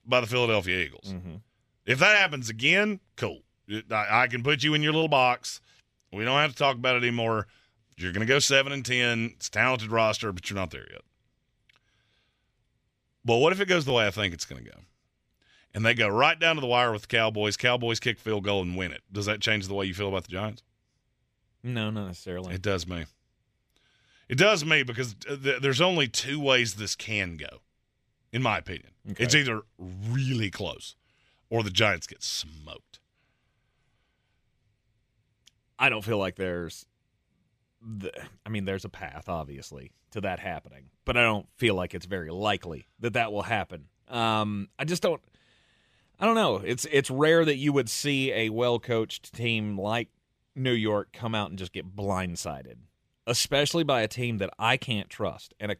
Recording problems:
none

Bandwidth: 14.5 kHz